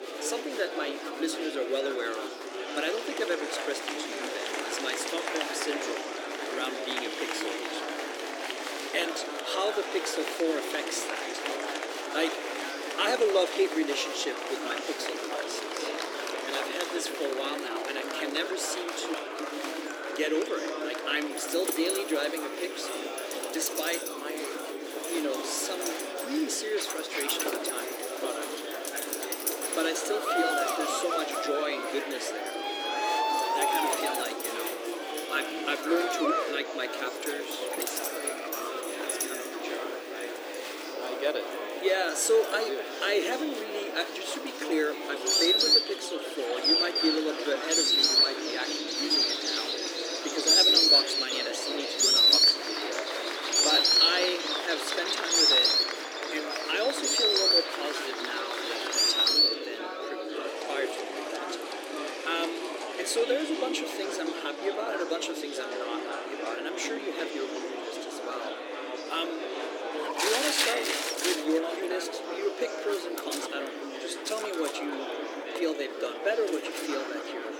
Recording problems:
thin; somewhat; fading below 300 Hz
animal sounds; very loud; throughout; 7 dB above the speech
murmuring crowd; loud; throughout; 2 dB below the speech

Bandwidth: 18 kHz